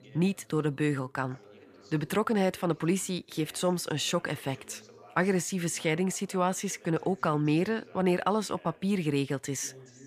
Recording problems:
background chatter; faint; throughout; 2 voices, 25 dB below the speech

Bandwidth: 15 kHz